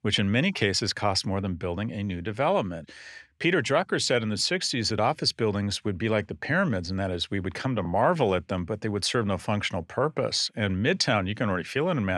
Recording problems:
abrupt cut into speech; at the end

